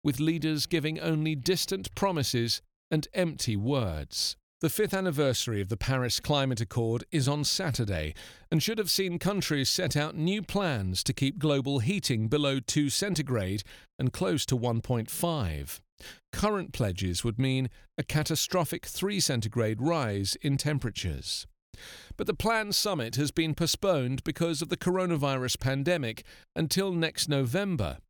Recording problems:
none

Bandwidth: 18.5 kHz